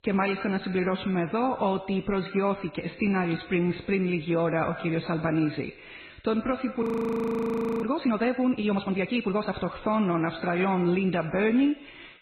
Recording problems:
garbled, watery; badly; nothing above 14.5 kHz
echo of what is said; noticeable; throughout; 90 ms later, 15 dB below the speech
audio freezing; at 7 s for 1 s

